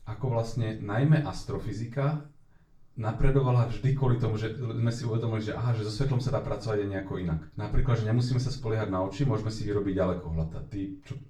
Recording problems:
off-mic speech; far
room echo; slight; dies away in 0.3 s

